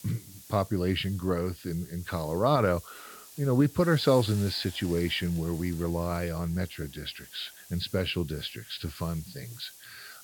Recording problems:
high frequencies cut off; noticeable; nothing above 5 kHz
hiss; noticeable; throughout; 15 dB below the speech

